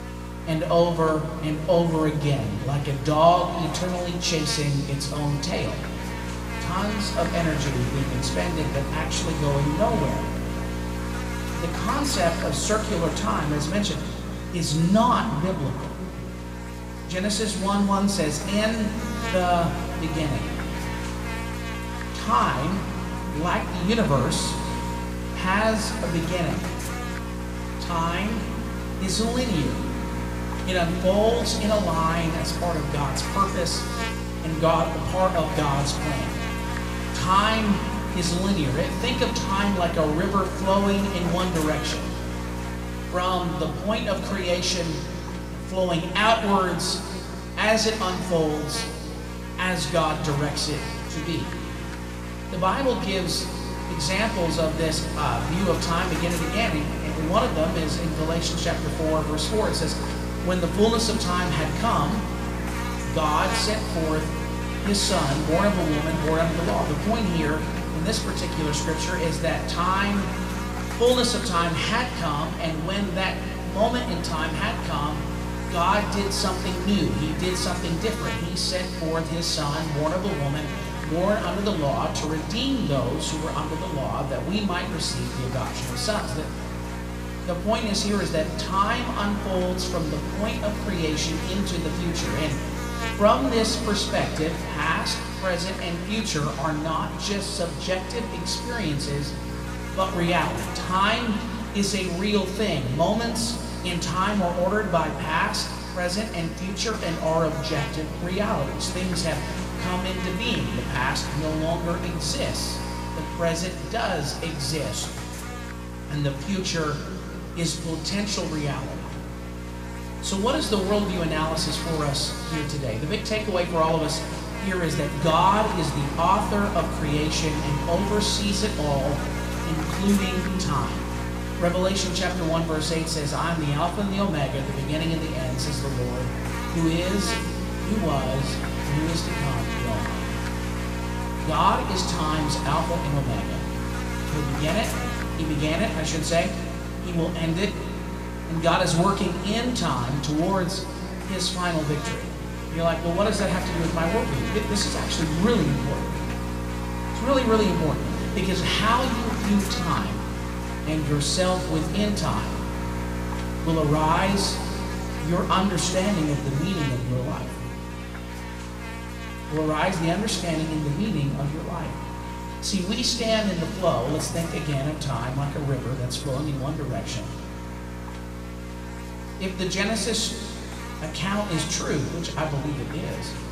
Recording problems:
room echo; noticeable; dies away in 2 s
off-mic speech; somewhat distant
electrical hum; loud; throughout; 60 Hz, 8 dB below the speech

